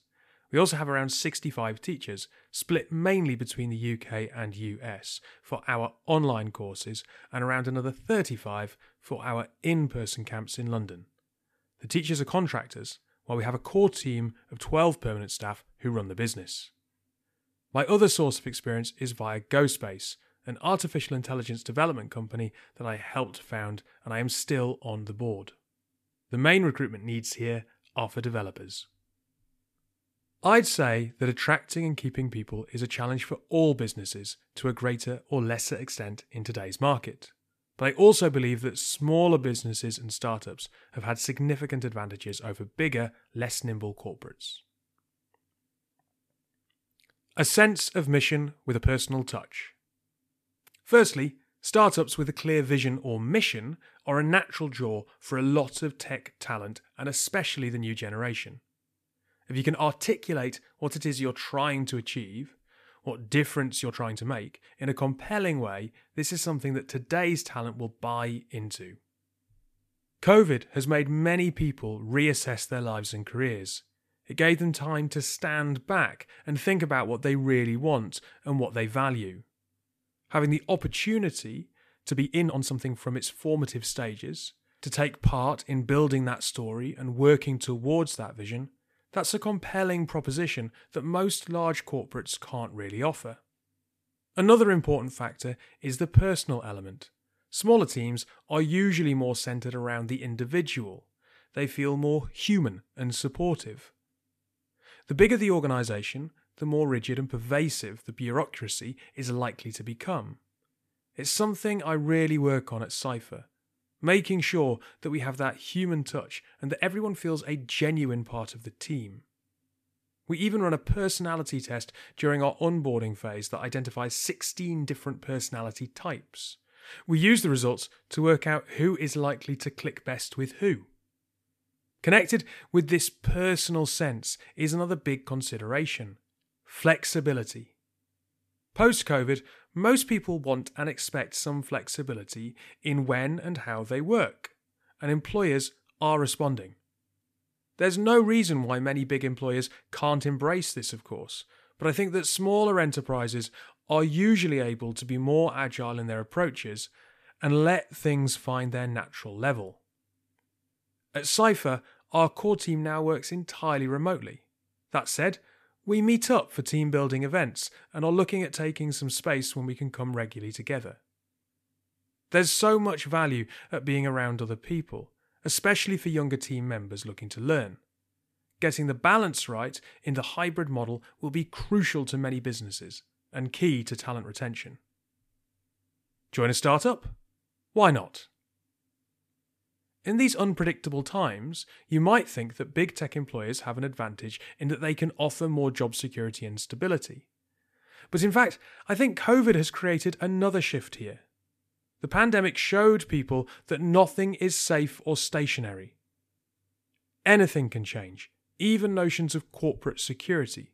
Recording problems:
uneven, jittery; strongly; from 14 s to 2:30

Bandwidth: 14.5 kHz